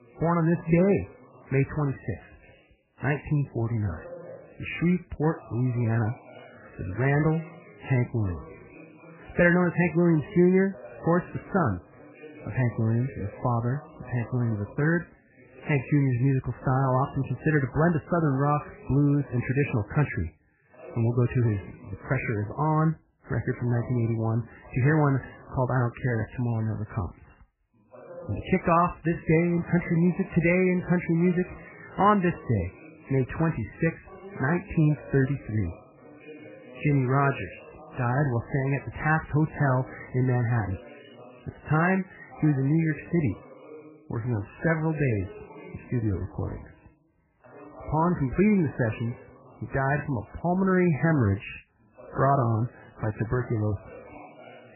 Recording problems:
garbled, watery; badly; nothing above 2.5 kHz
voice in the background; faint; throughout; 20 dB below the speech

